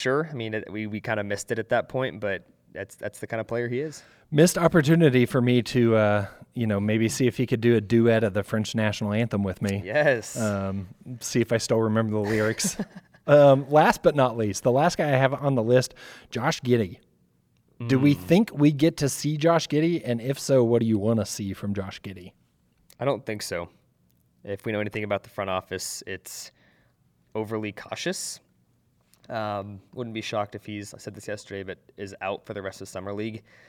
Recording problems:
abrupt cut into speech; at the start

